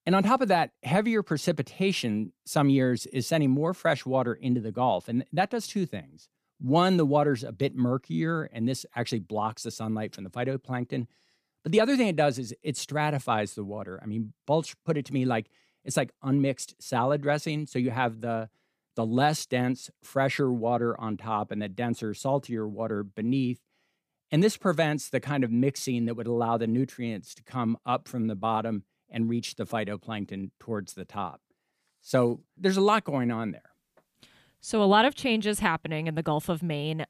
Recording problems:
none

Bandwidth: 15 kHz